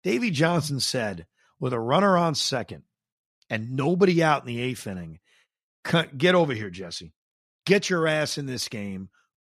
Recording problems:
none

